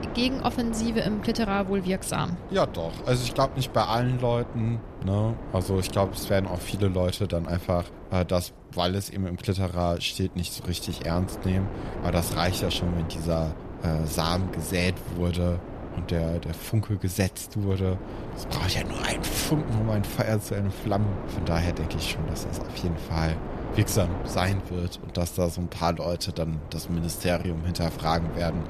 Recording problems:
wind noise on the microphone; heavy; 10 dB below the speech

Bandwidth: 14 kHz